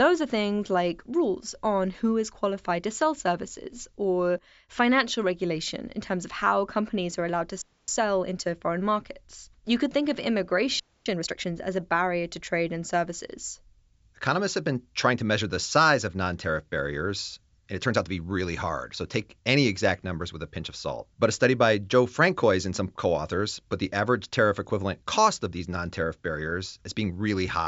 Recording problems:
high frequencies cut off; noticeable; nothing above 7.5 kHz
abrupt cut into speech; at the start and the end
audio freezing; at 7.5 s and at 11 s

